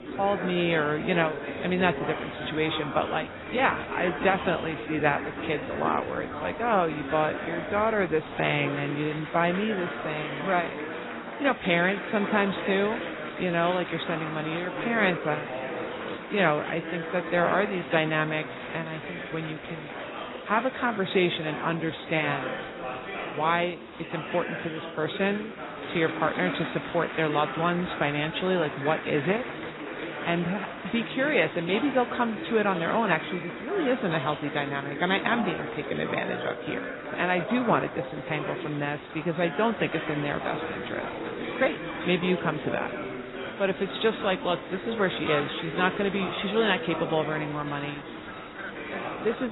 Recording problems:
garbled, watery; badly; nothing above 4 kHz
chatter from many people; loud; throughout; 7 dB below the speech
abrupt cut into speech; at the end

